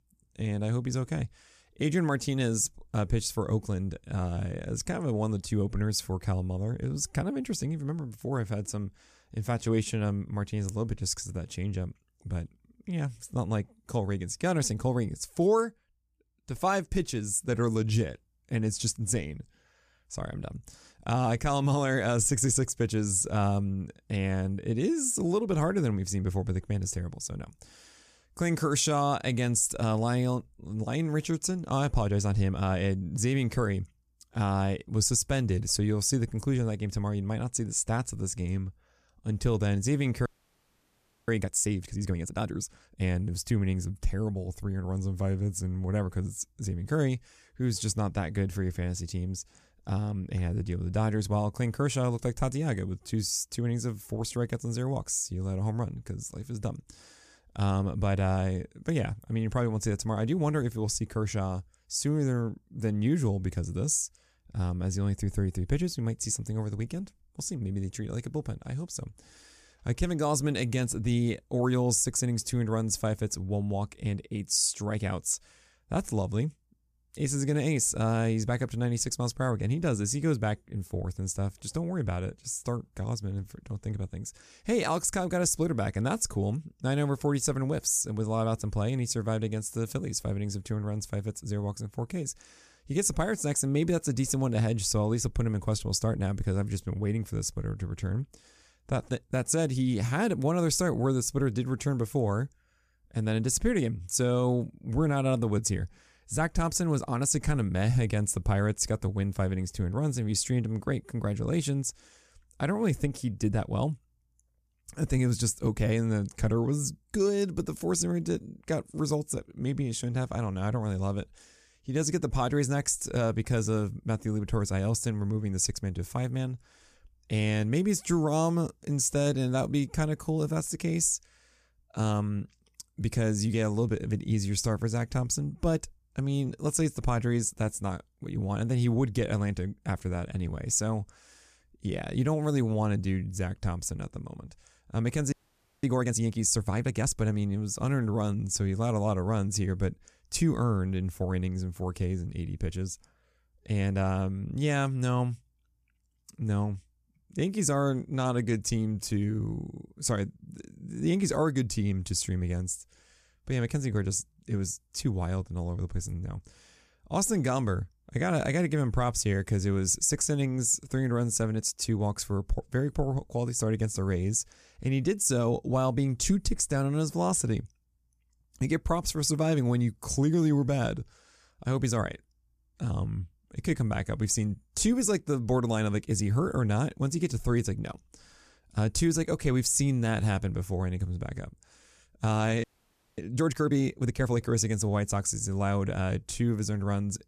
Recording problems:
audio freezing; at 40 s for 1 s, at 2:25 for 0.5 s and at 3:13 for 0.5 s

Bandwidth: 14.5 kHz